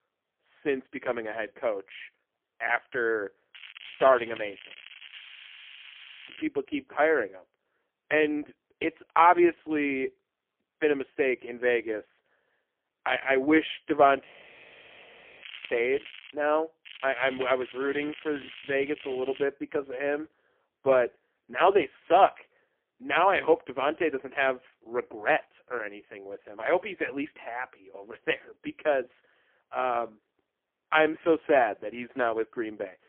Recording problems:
phone-call audio; poor line; nothing above 3.5 kHz
crackling; noticeable; from 3.5 to 6.5 s, at 15 s and from 17 to 19 s; 15 dB below the speech
audio freezing; at 5 s for 1 s and at 14 s for 1 s

